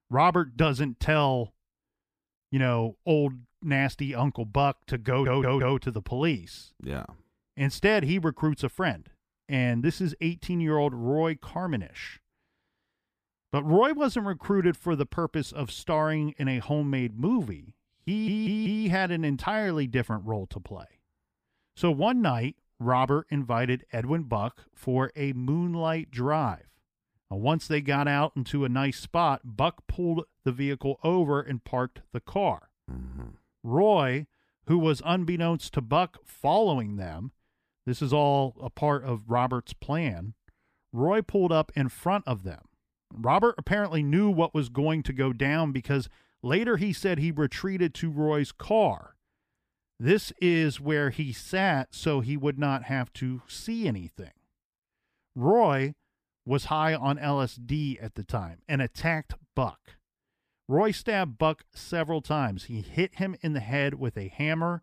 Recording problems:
audio stuttering; at 5 s and at 18 s

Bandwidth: 15 kHz